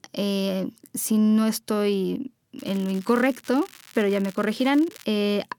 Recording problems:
crackling; faint; from 2.5 to 5 s; 20 dB below the speech

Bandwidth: 17.5 kHz